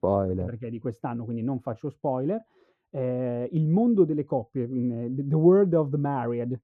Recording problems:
muffled; very; fading above 1.5 kHz

